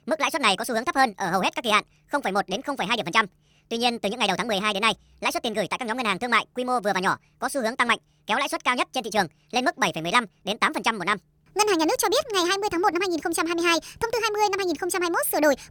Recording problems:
wrong speed and pitch; too fast and too high; 1.5 times normal speed

